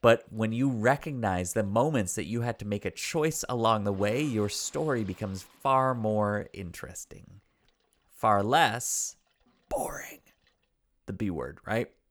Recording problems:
household noises; faint; throughout; 30 dB below the speech

